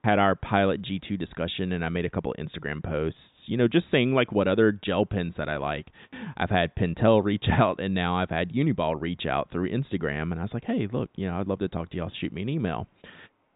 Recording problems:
high frequencies cut off; severe; nothing above 4 kHz

